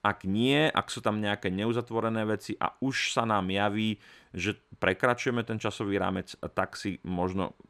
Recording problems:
none

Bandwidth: 14.5 kHz